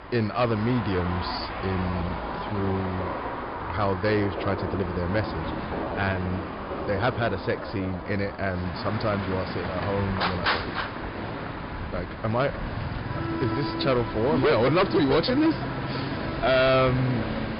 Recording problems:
distortion; heavy; 5% of the sound clipped
high frequencies cut off; noticeable; nothing above 5 kHz
traffic noise; loud; throughout; 6 dB below the speech
animal sounds; noticeable; throughout; 10 dB below the speech
uneven, jittery; strongly; from 0.5 to 17 s

